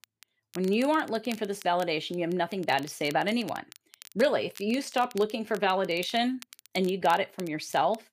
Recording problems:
crackle, like an old record; faint; 20 dB below the speech

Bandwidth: 15 kHz